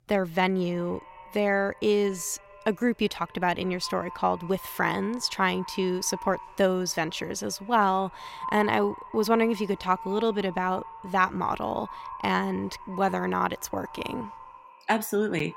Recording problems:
echo of what is said; noticeable; throughout; 200 ms later, 15 dB below the speech

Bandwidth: 16 kHz